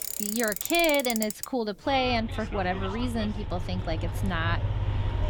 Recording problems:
traffic noise; loud; throughout; 4 dB below the speech

